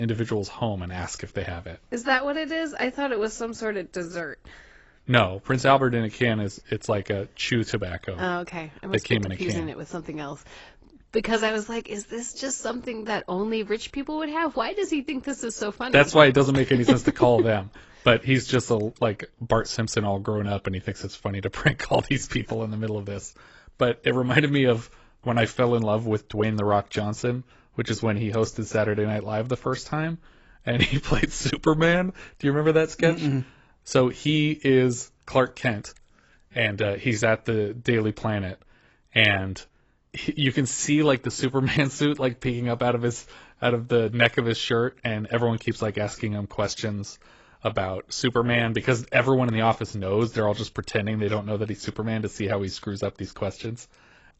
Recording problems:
garbled, watery; badly; nothing above 8 kHz
abrupt cut into speech; at the start

